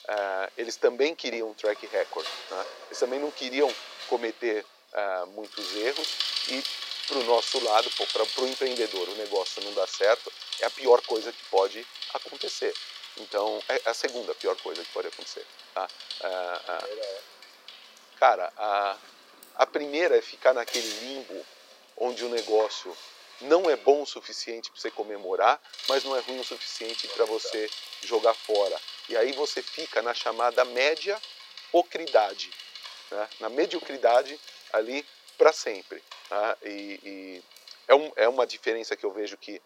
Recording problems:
thin; somewhat; fading below 400 Hz
traffic noise; loud; throughout; 8 dB below the speech

